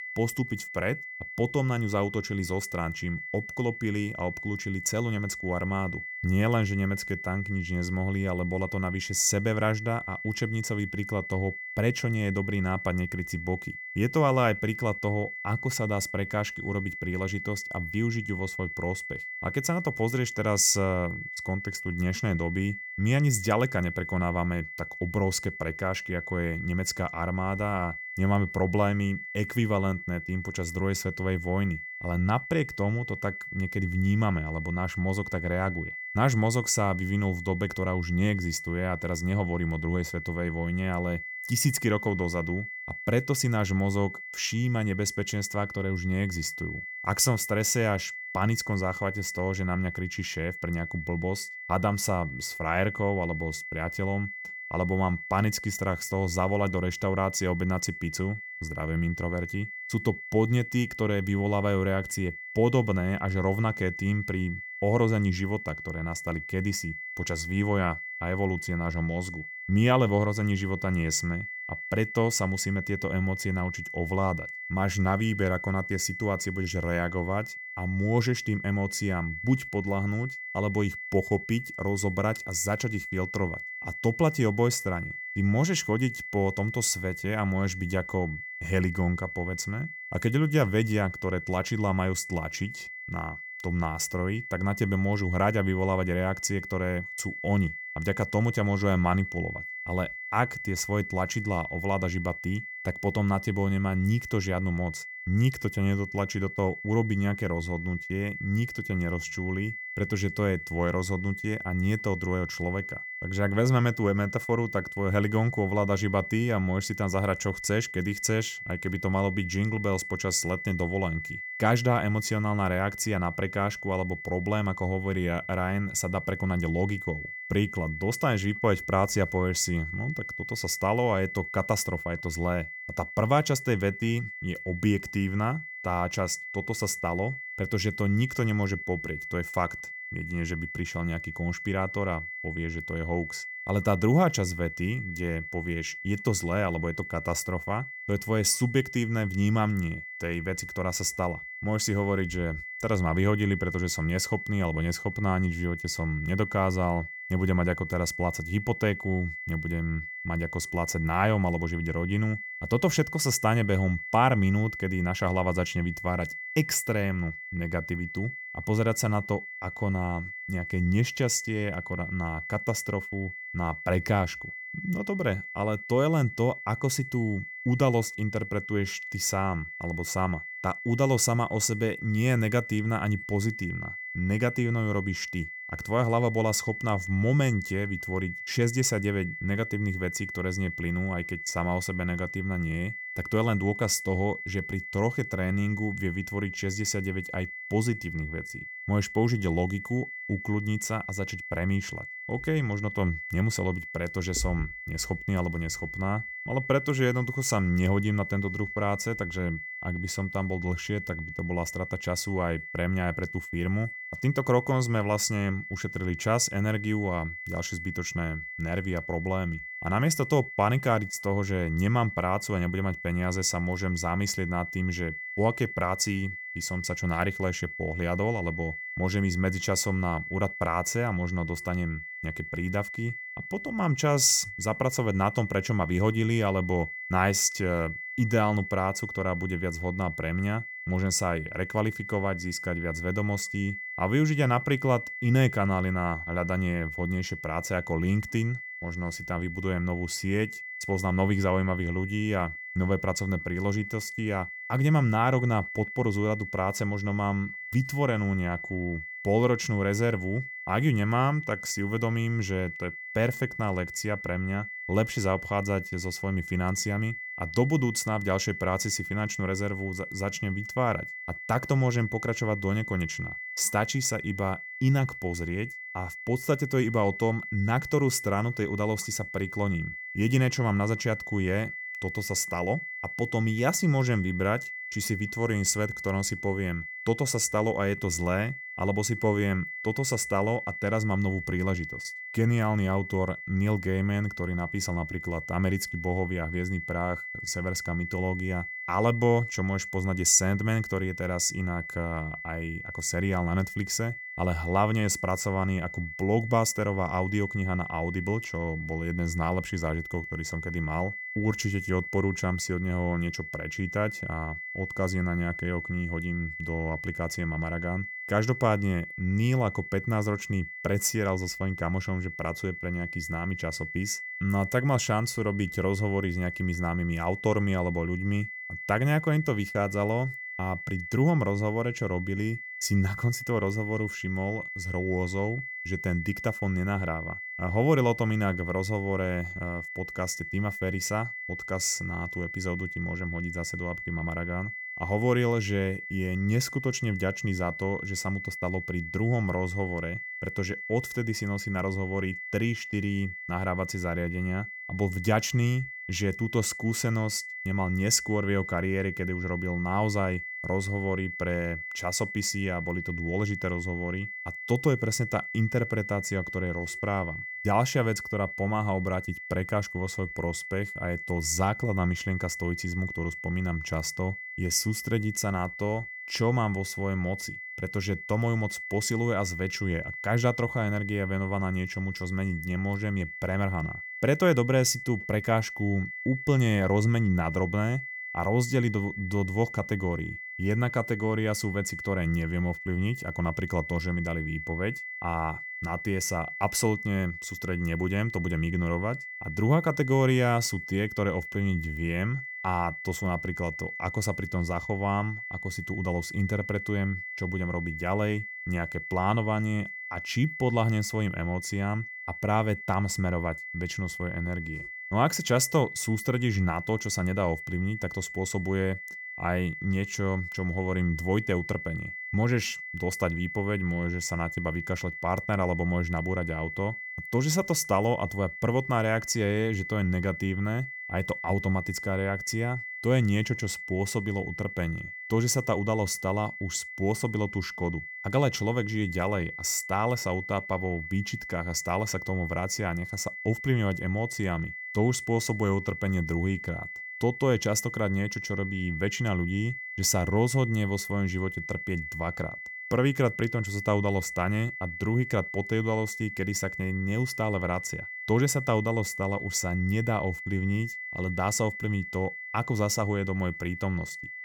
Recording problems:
high-pitched whine; loud; throughout; 2 kHz, 8 dB below the speech

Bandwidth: 17.5 kHz